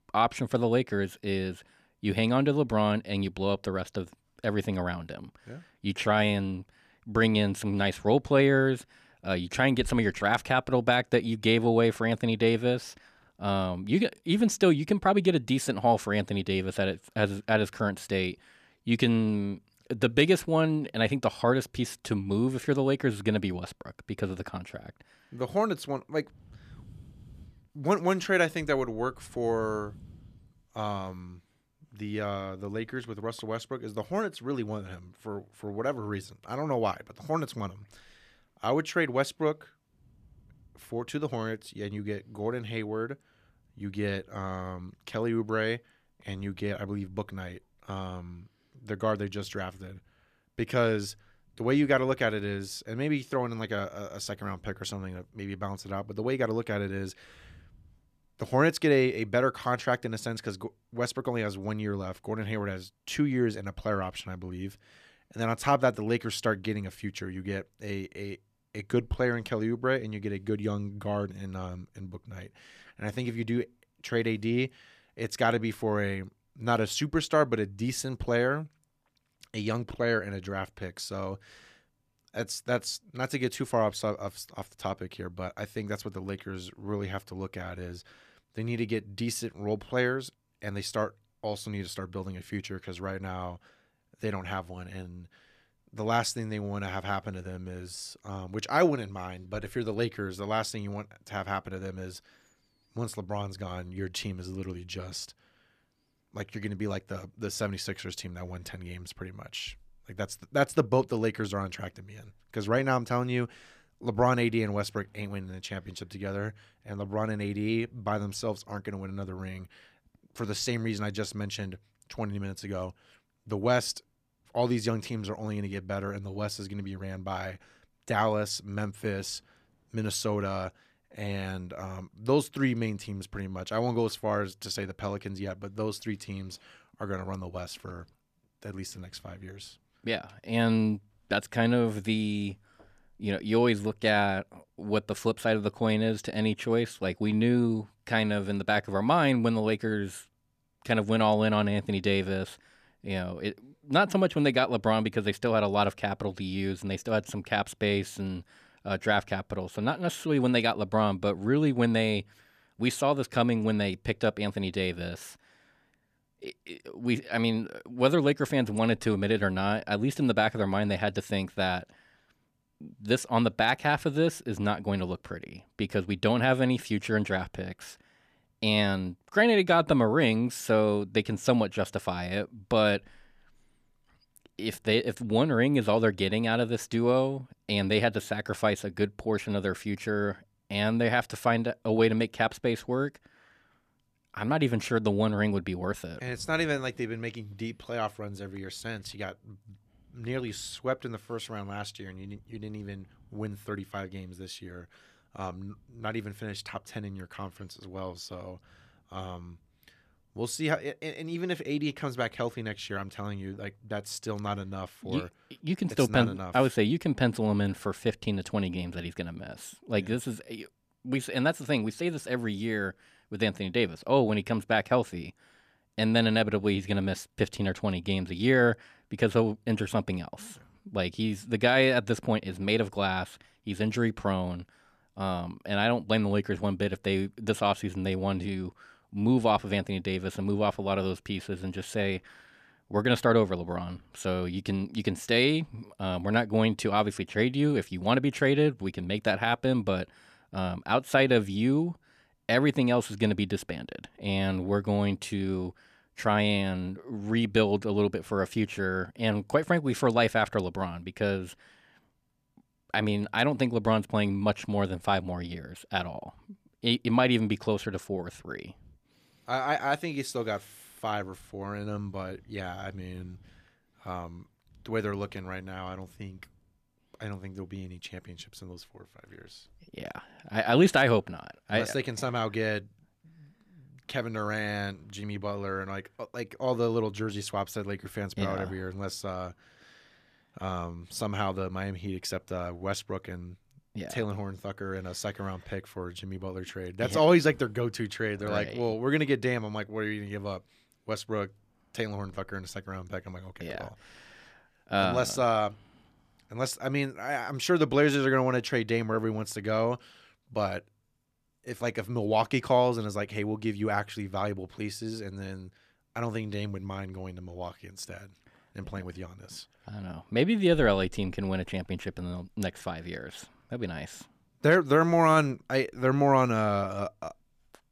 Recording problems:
none

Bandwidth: 14.5 kHz